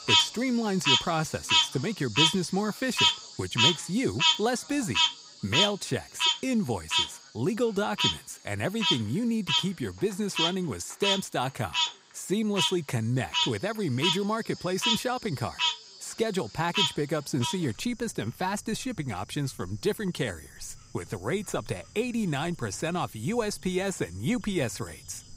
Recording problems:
animal sounds; very loud; throughout; 4 dB above the speech

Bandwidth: 15.5 kHz